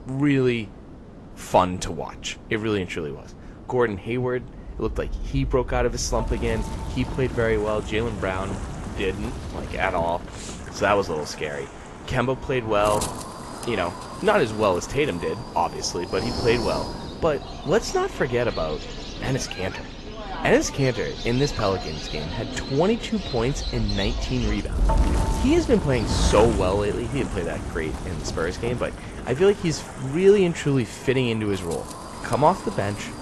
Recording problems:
garbled, watery; slightly; nothing above 12 kHz
animal sounds; noticeable; from 18 s on; 10 dB below the speech
wind noise on the microphone; occasional gusts; 10 dB below the speech

